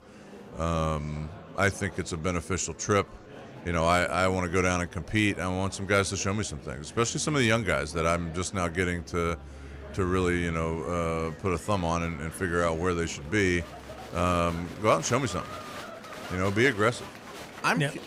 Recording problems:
murmuring crowd; noticeable; throughout; 15 dB below the speech

